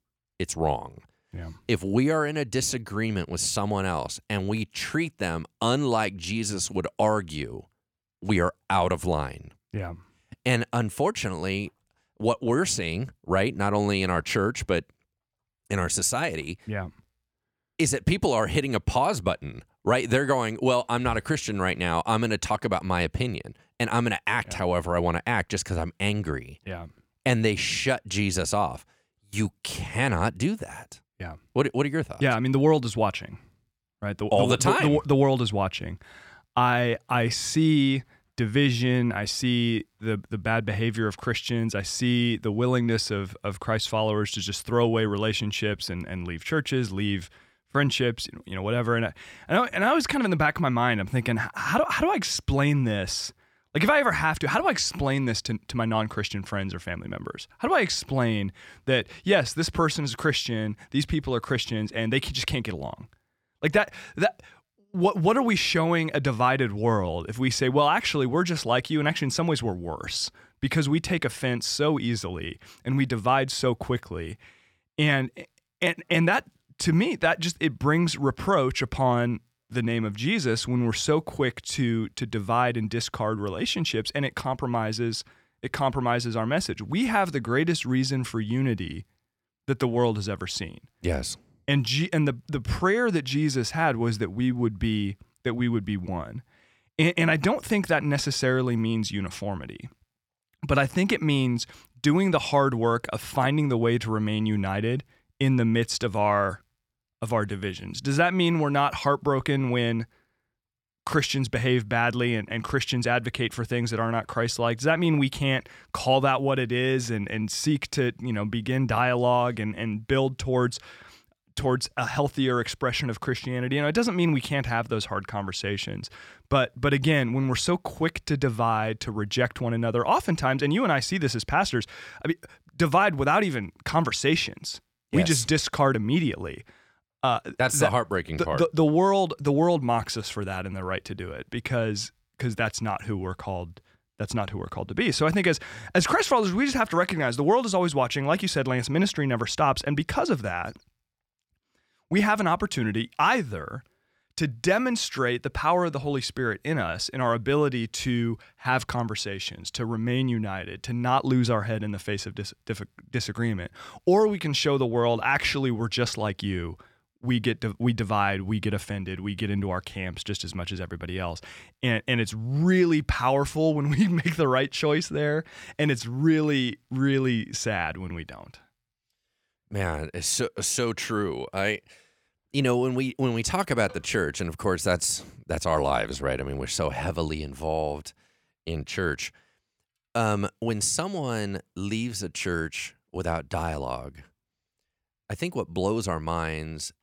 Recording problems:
none

